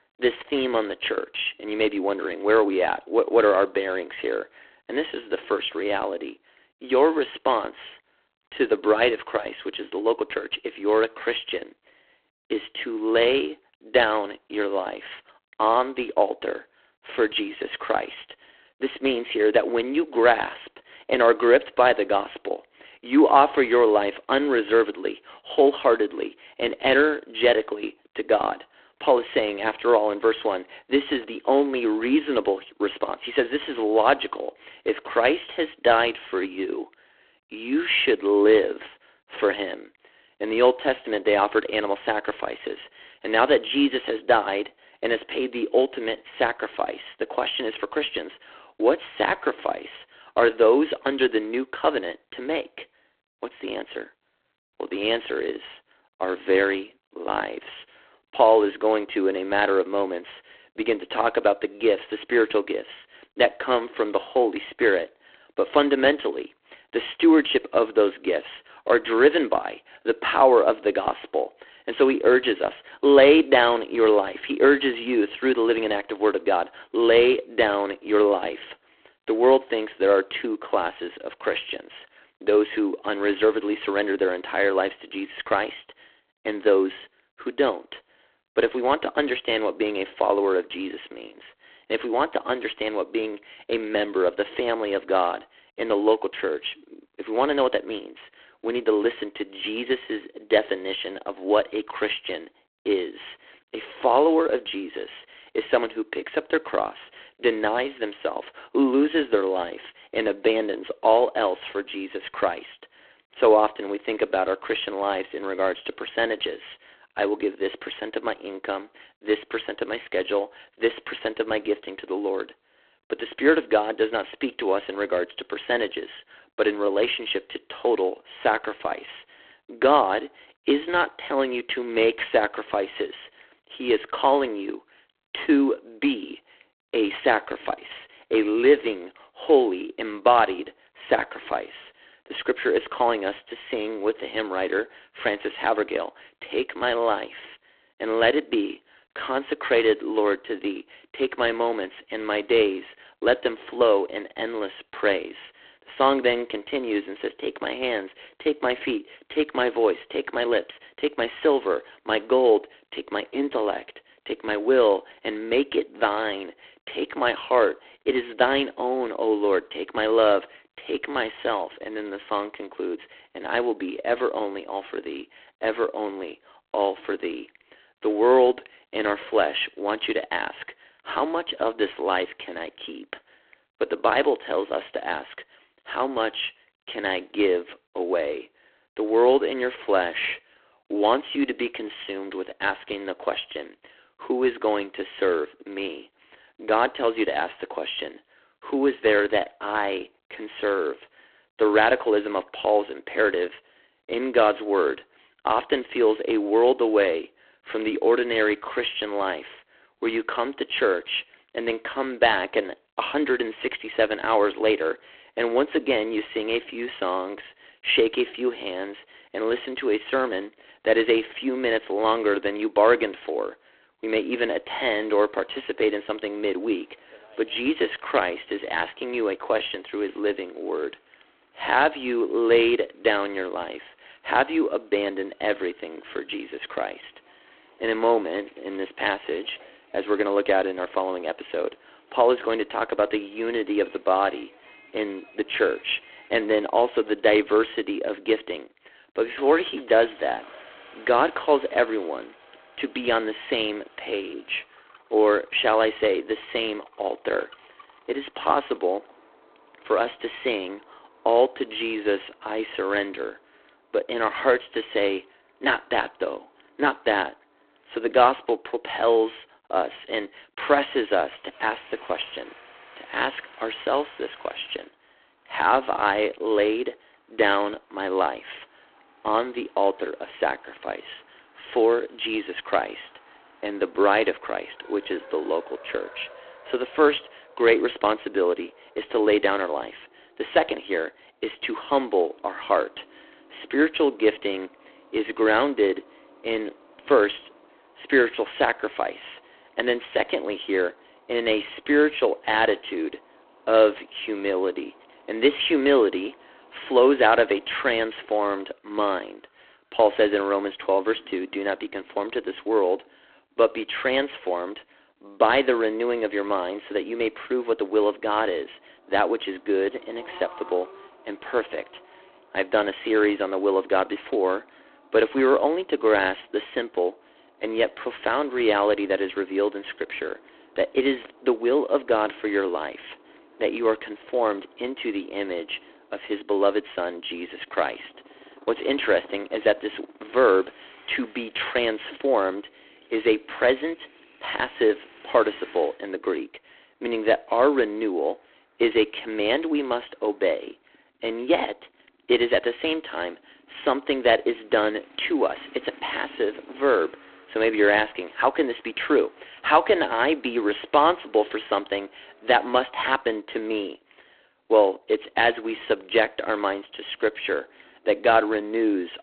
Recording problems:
phone-call audio; poor line
traffic noise; faint; from 3:45 on; 30 dB below the speech

